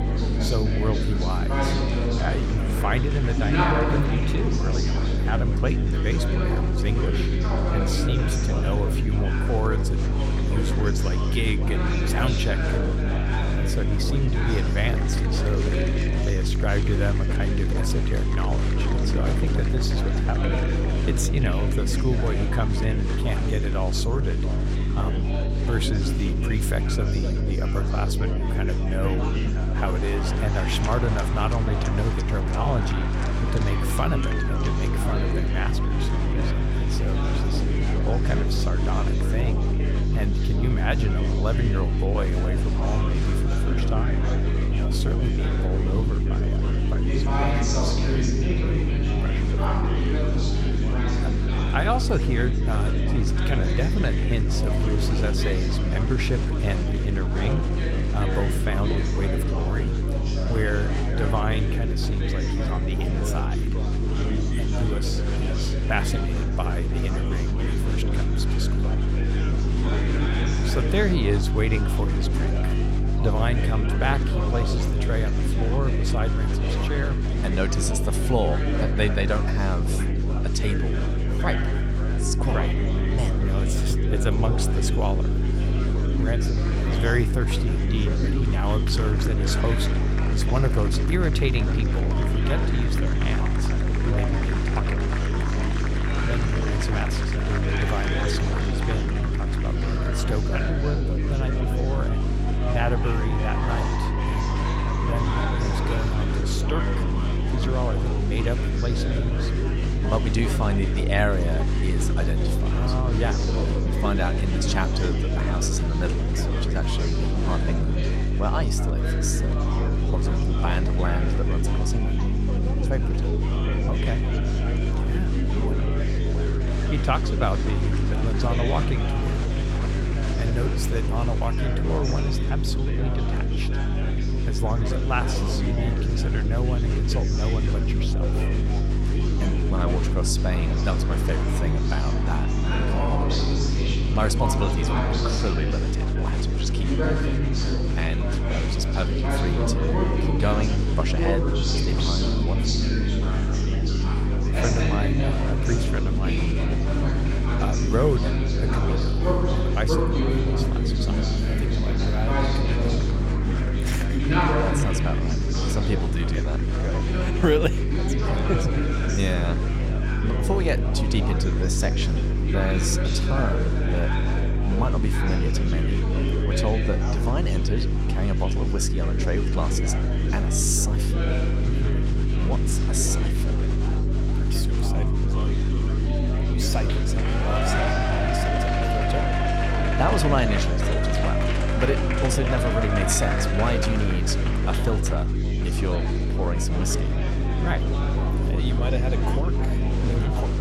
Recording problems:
electrical hum; loud; throughout; 50 Hz, 5 dB below the speech
murmuring crowd; loud; throughout; 1 dB below the speech

